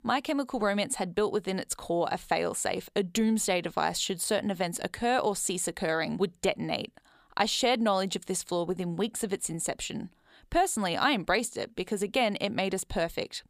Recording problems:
none

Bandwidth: 15 kHz